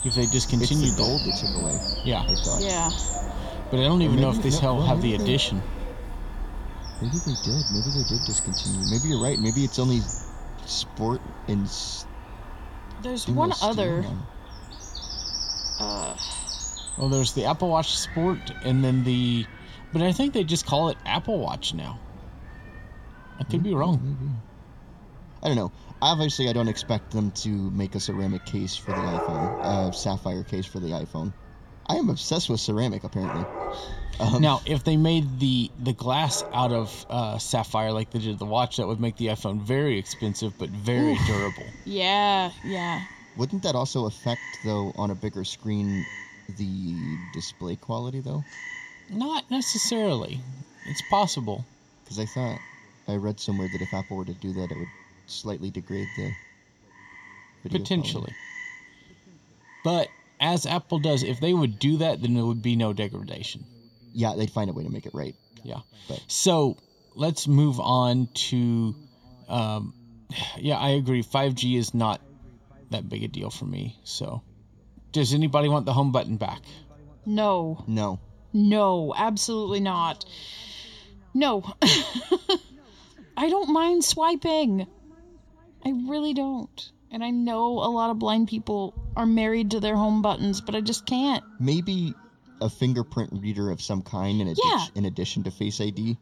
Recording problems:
room echo; slight; dies away in 3 s
animal sounds; loud; throughout; 7 dB below the speech

